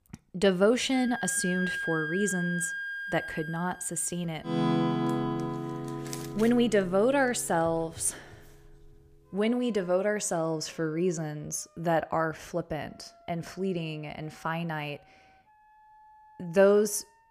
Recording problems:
background music; loud; throughout; 4 dB below the speech

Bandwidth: 15 kHz